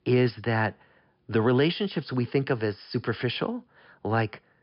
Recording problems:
high frequencies cut off; noticeable; nothing above 5.5 kHz

